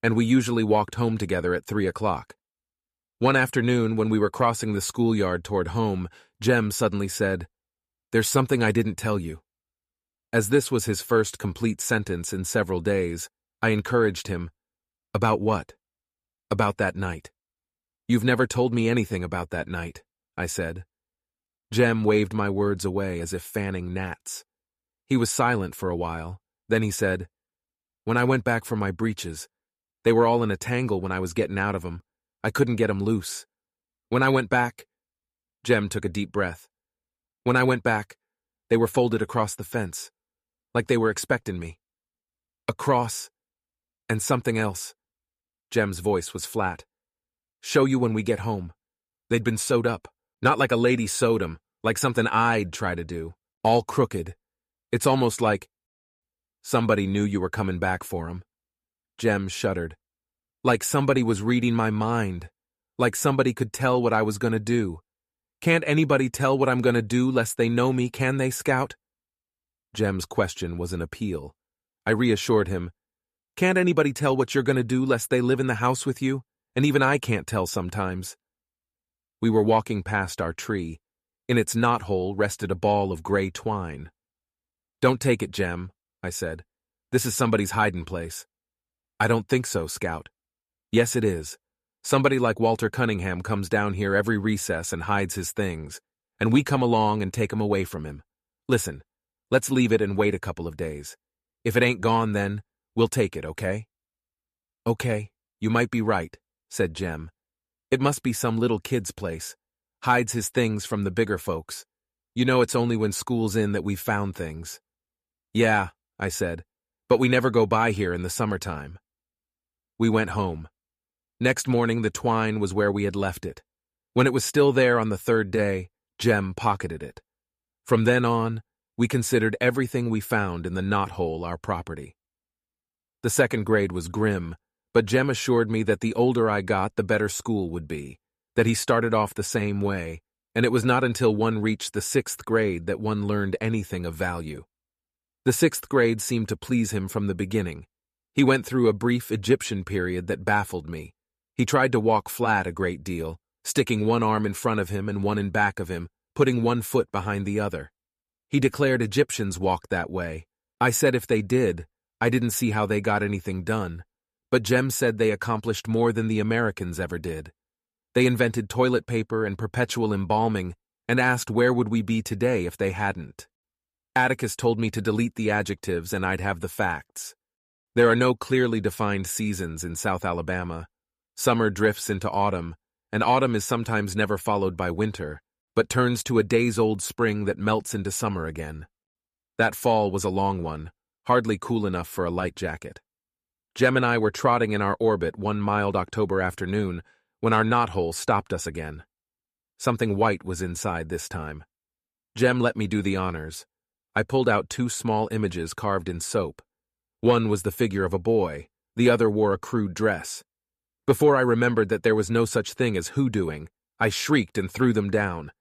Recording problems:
none

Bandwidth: 14.5 kHz